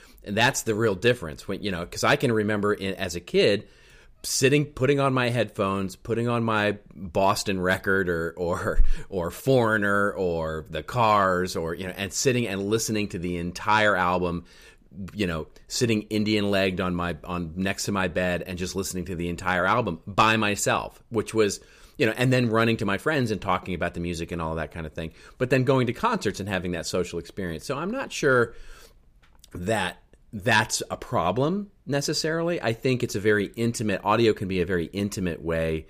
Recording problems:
none

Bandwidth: 15 kHz